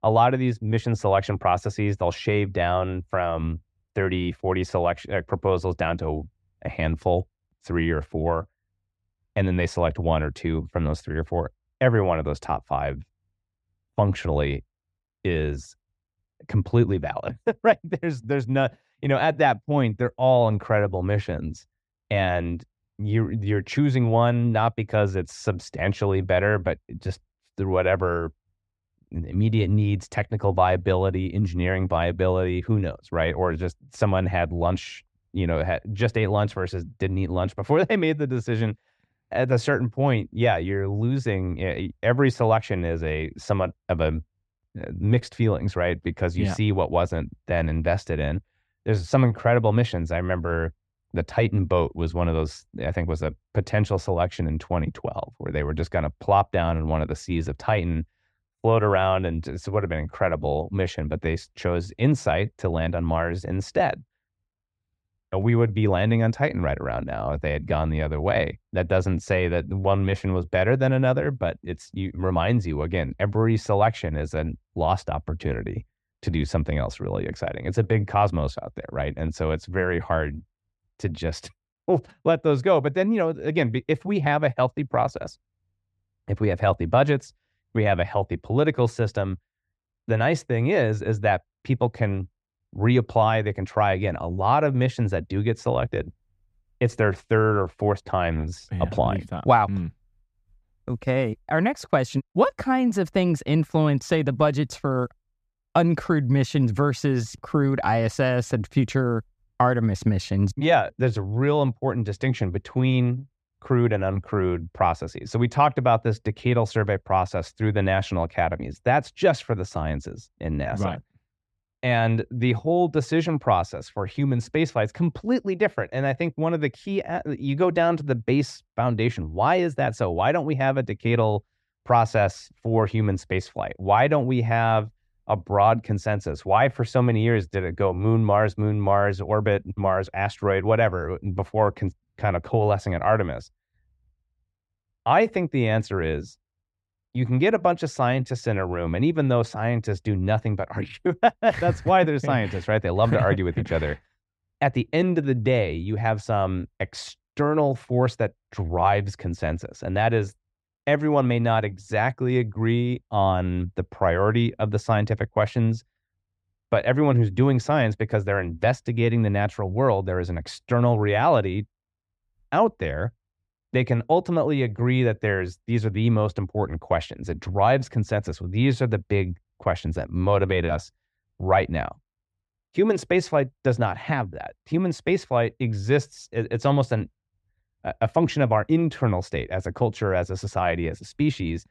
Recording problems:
muffled; very; fading above 2.5 kHz

